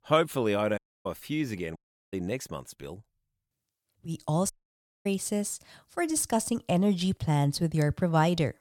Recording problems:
audio cutting out; at 1 s, at 2 s and at 4.5 s for 0.5 s

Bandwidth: 17.5 kHz